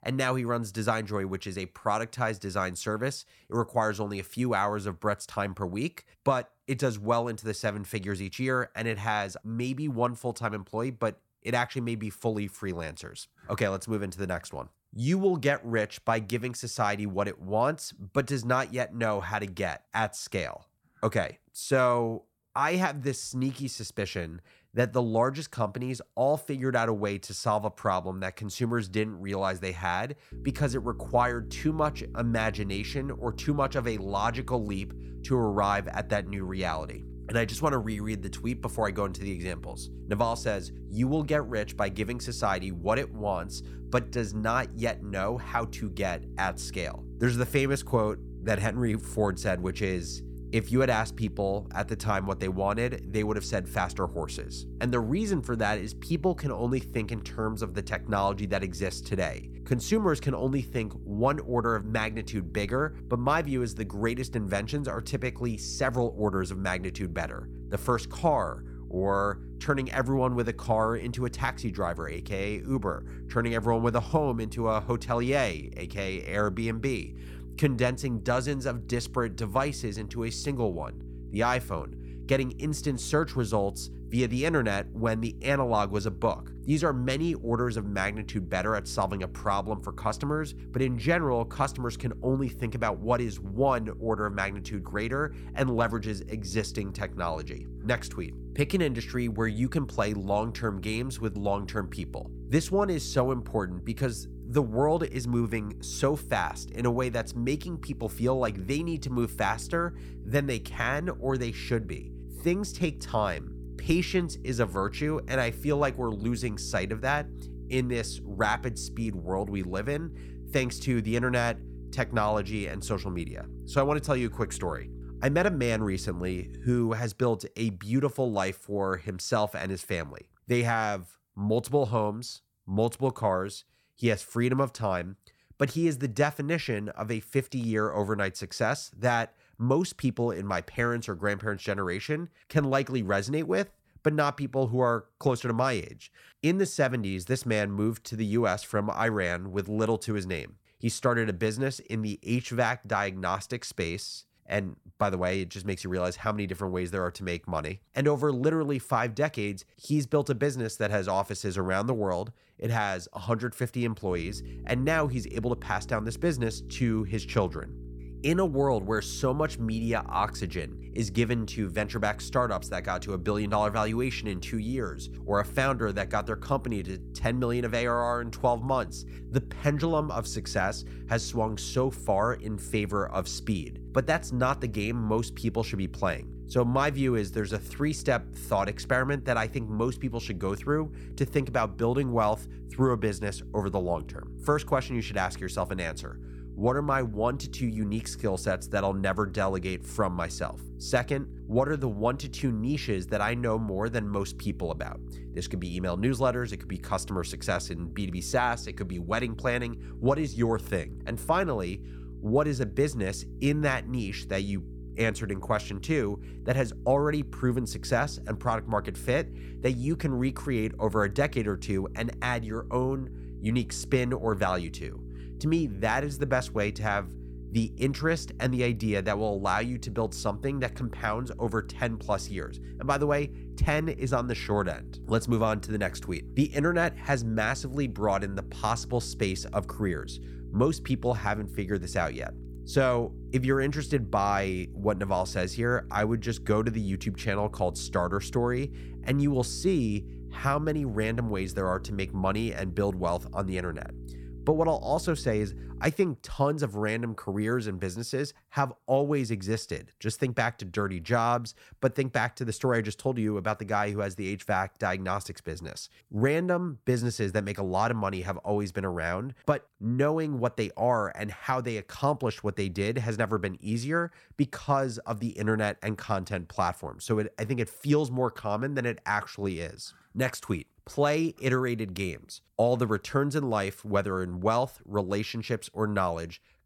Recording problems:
electrical hum; faint; from 30 s to 2:07 and from 2:44 to 4:16; 60 Hz, 20 dB below the speech

